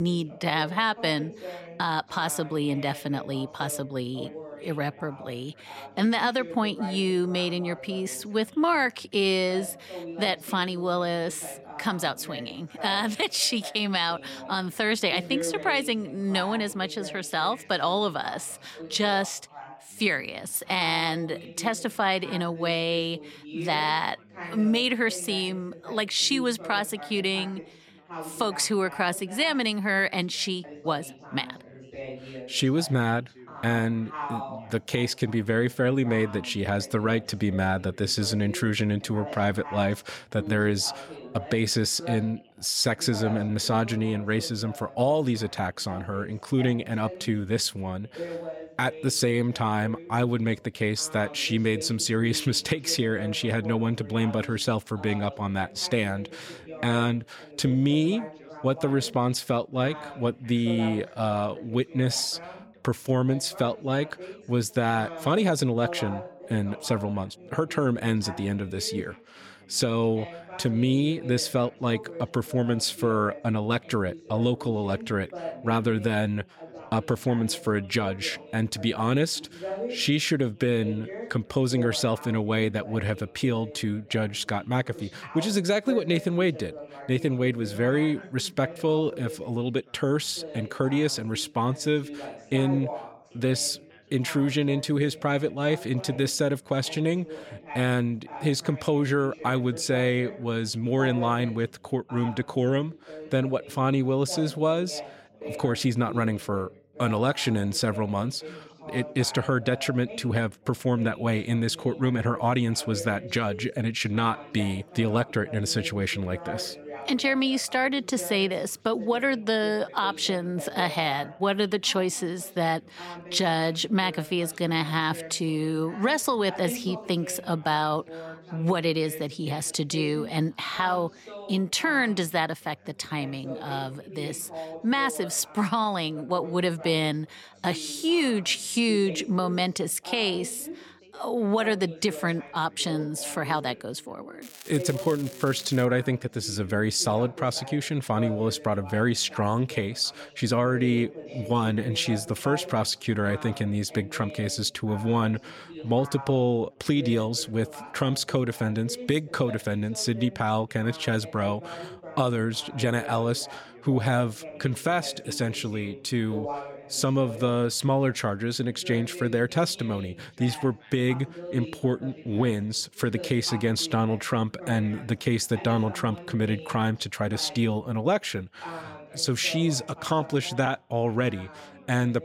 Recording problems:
background chatter; noticeable; throughout; 3 voices, 15 dB below the speech
crackling; noticeable; from 2:24 to 2:26; 15 dB below the speech
abrupt cut into speech; at the start

